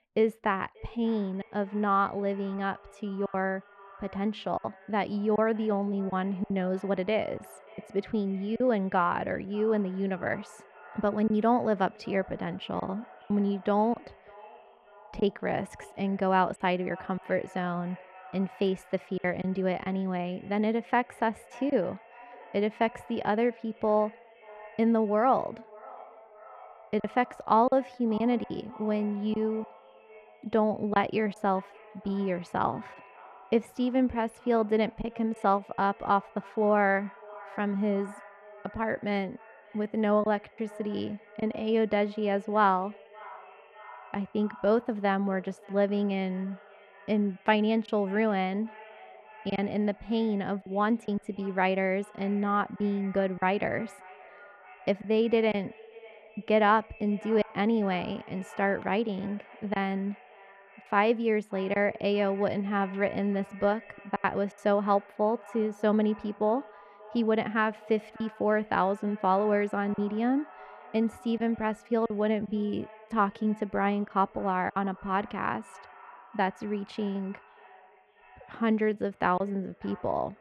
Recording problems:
muffled; slightly; fading above 3 kHz
echo of what is said; faint; throughout; 580 ms later, 20 dB below the speech
choppy; occasionally; 3% of the speech affected

